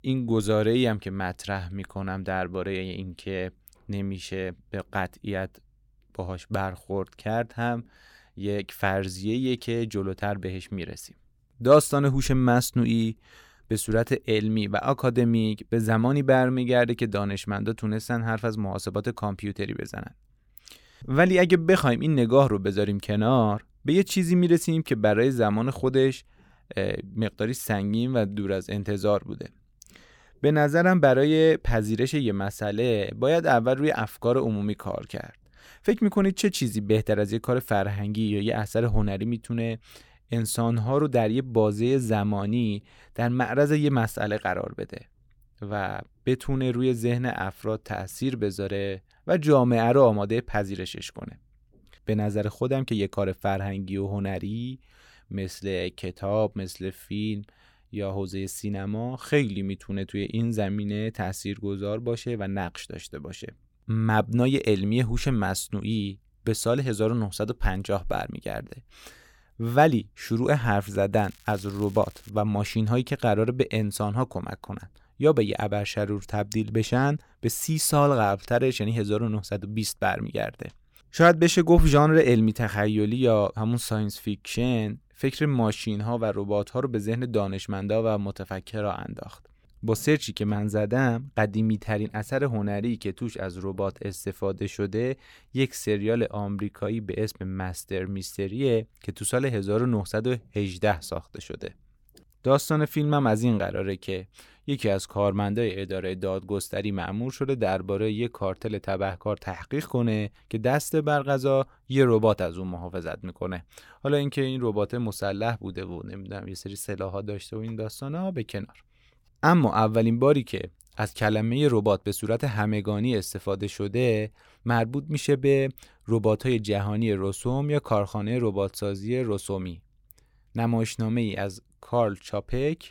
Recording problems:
crackling; faint; from 1:11 to 1:12; 25 dB below the speech

